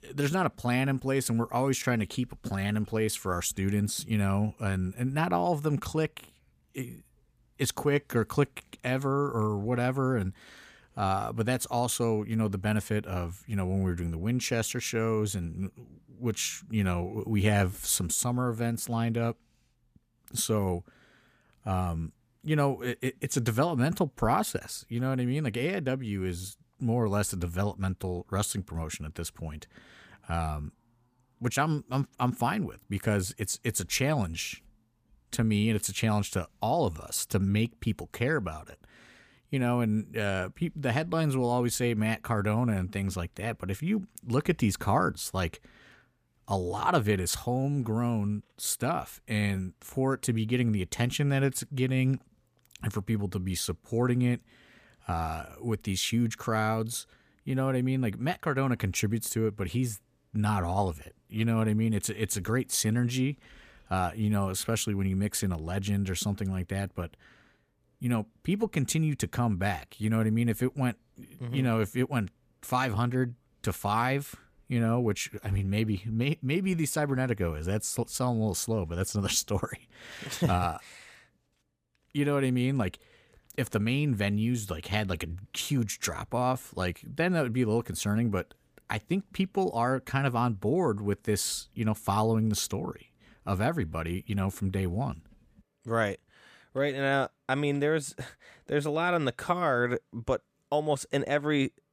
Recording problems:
none

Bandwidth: 15 kHz